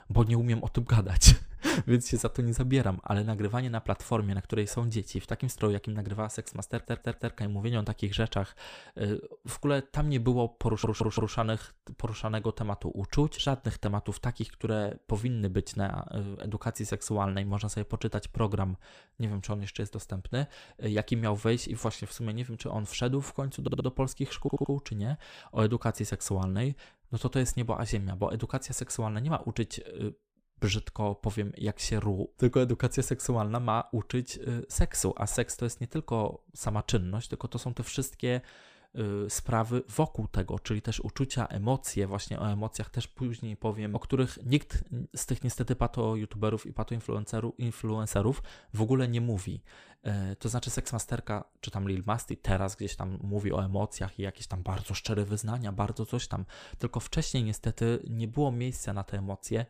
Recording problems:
audio stuttering; 4 times, first at 6.5 s

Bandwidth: 15 kHz